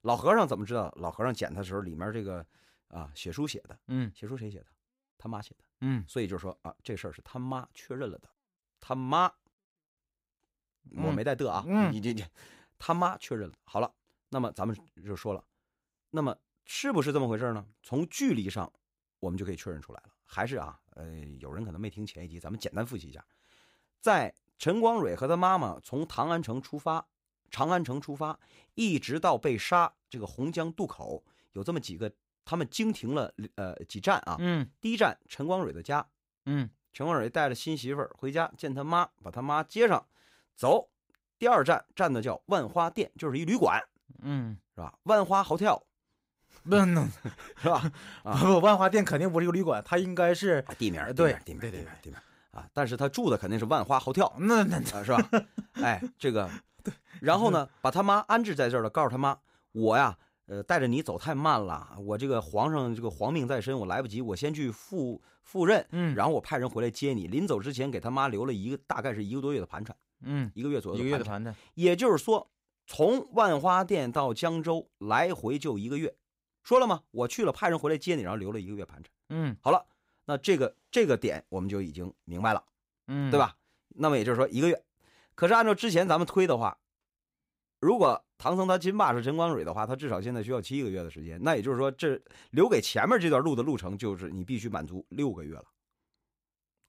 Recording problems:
none

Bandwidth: 15.5 kHz